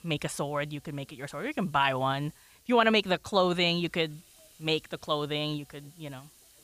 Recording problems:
hiss; faint; throughout; 30 dB below the speech

